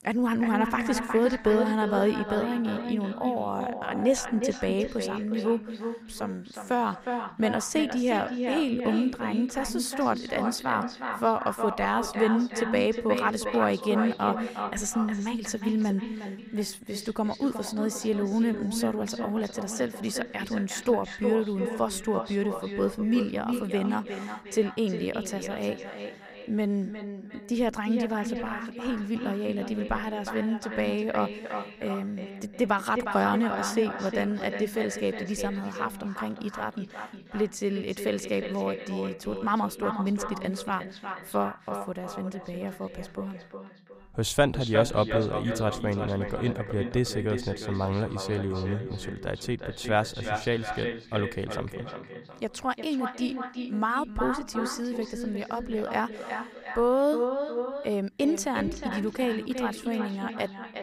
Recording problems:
echo of what is said; strong; throughout; 360 ms later, 6 dB below the speech

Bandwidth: 15.5 kHz